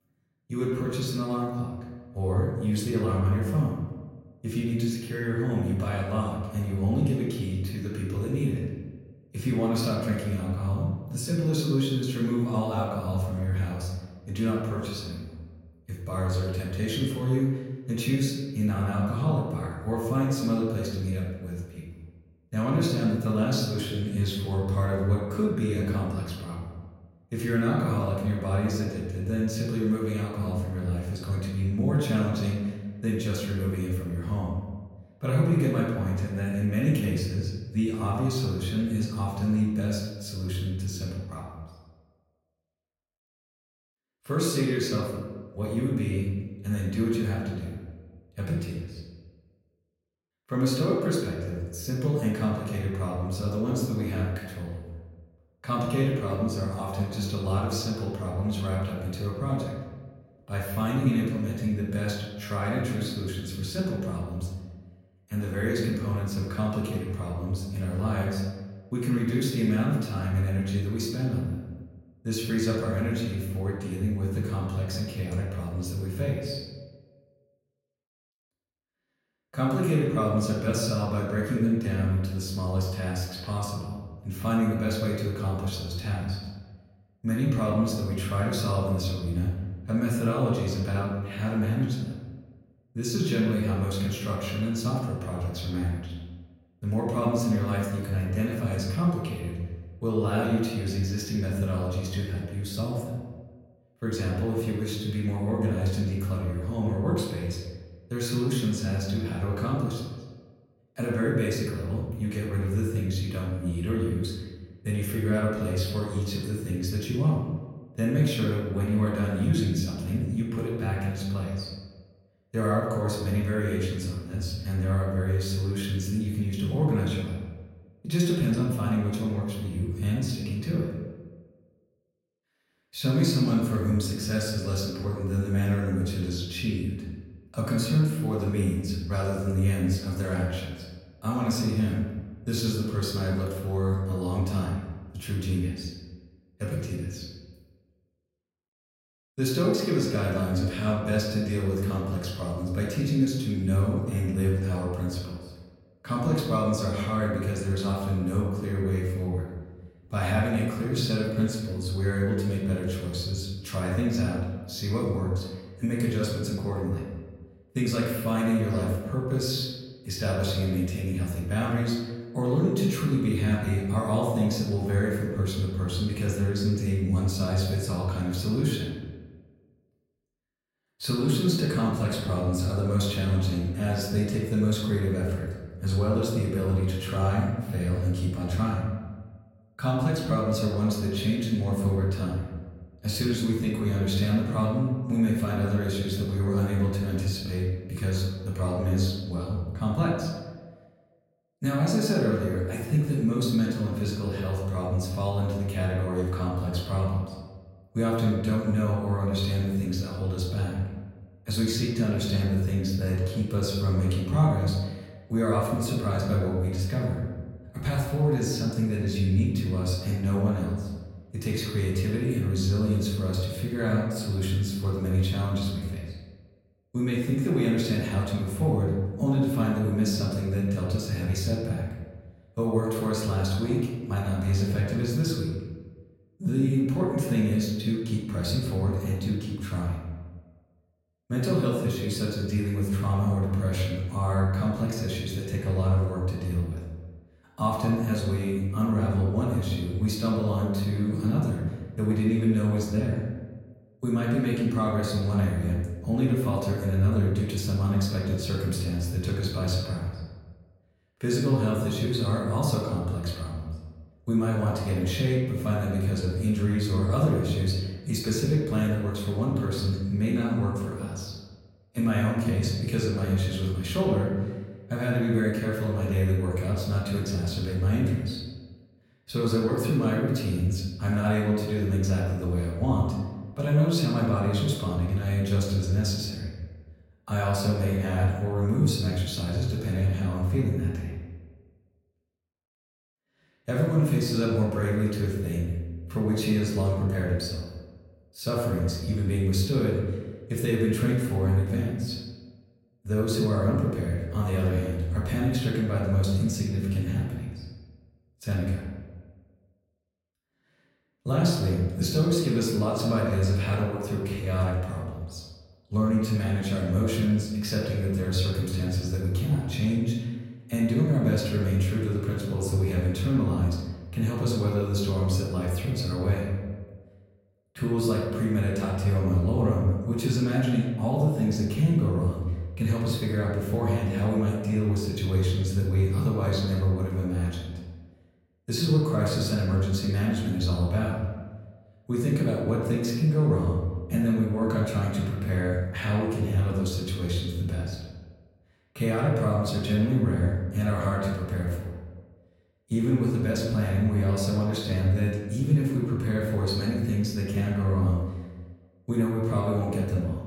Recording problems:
off-mic speech; far
room echo; noticeable; dies away in 1.2 s

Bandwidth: 16.5 kHz